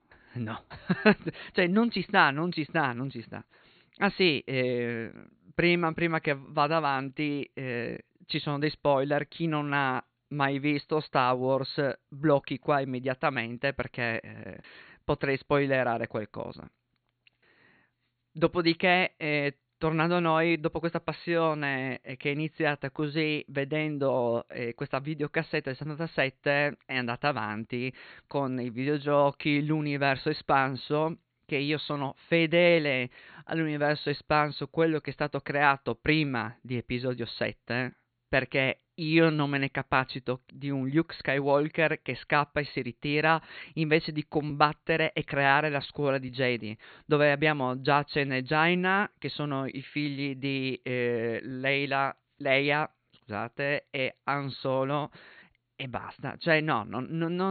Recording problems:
high frequencies cut off; severe; nothing above 4.5 kHz
abrupt cut into speech; at the end

